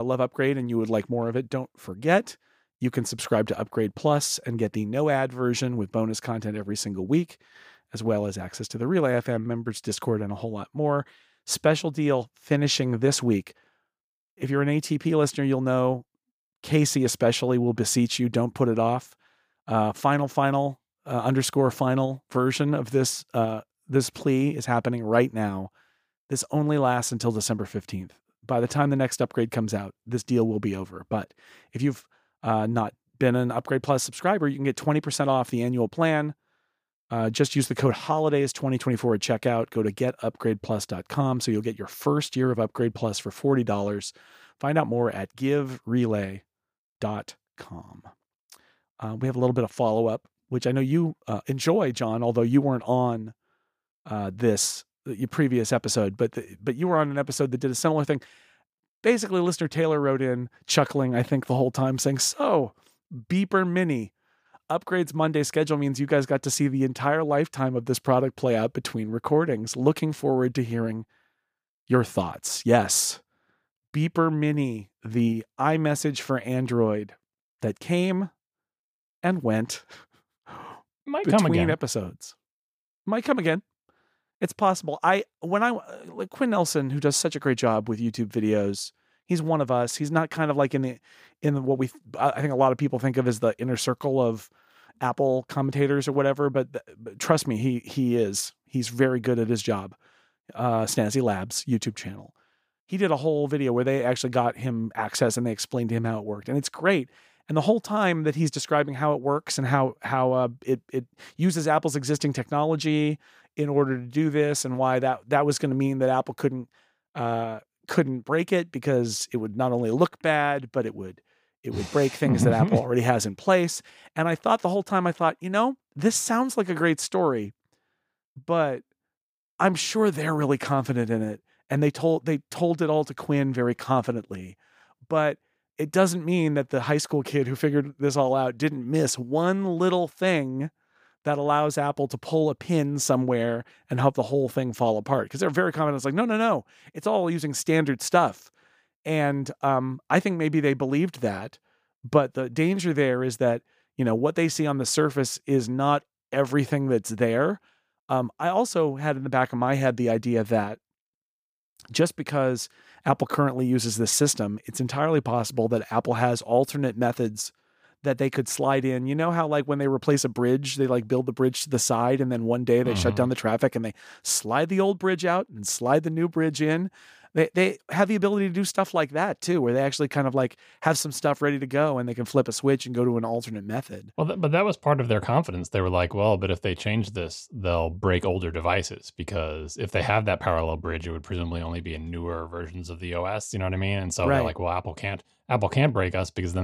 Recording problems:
abrupt cut into speech; at the start and the end

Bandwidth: 15 kHz